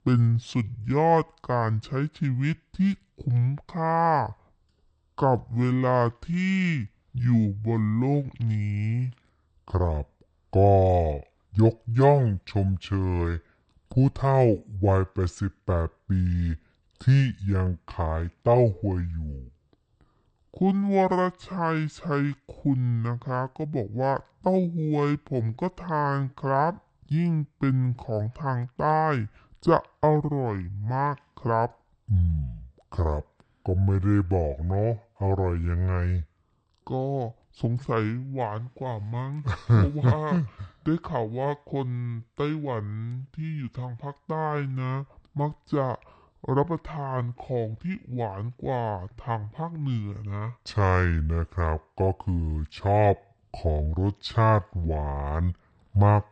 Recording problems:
wrong speed and pitch; too slow and too low; 0.6 times normal speed

